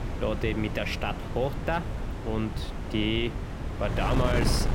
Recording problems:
wind noise on the microphone; heavy; 7 dB below the speech

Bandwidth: 16 kHz